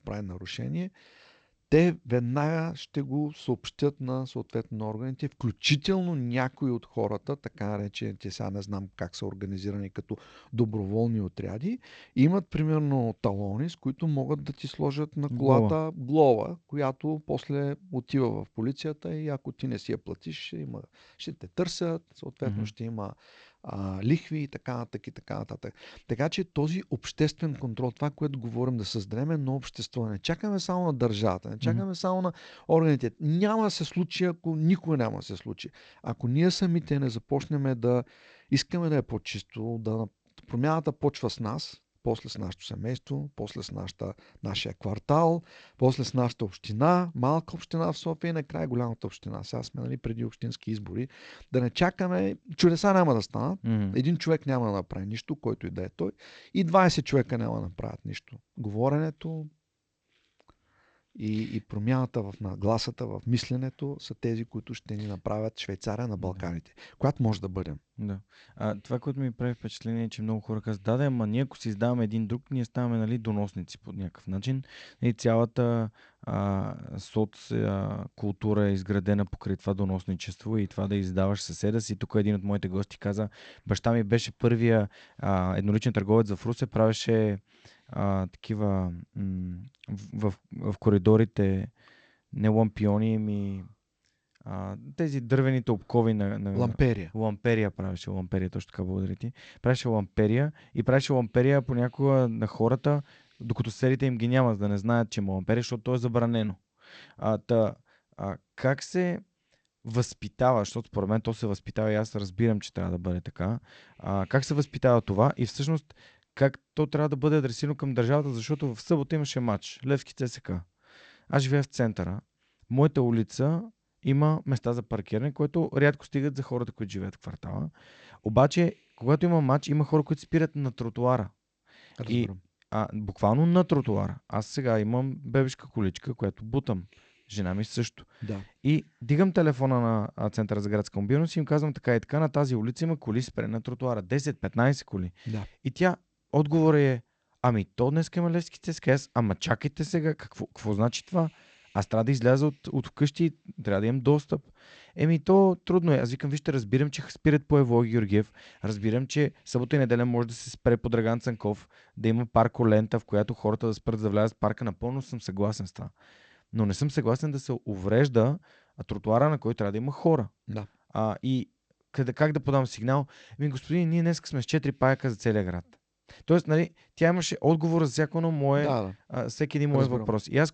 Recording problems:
garbled, watery; slightly; nothing above 8 kHz

